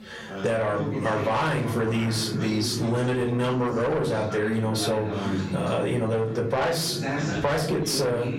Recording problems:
distortion; heavy; 8 dB below the speech
off-mic speech; far
echo of what is said; faint; throughout; 560 ms later, 20 dB below the speech
room echo; very slight; dies away in 0.4 s
squashed, flat; somewhat
background chatter; loud; throughout; 3 voices, 7 dB below the speech

